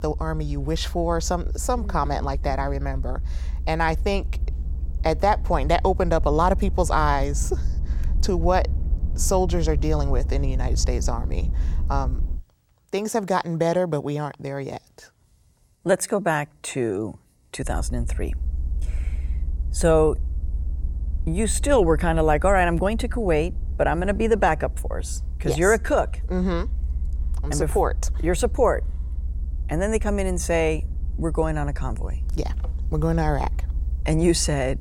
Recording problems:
low rumble; faint; until 12 s and from 18 s on; 25 dB below the speech

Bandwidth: 17 kHz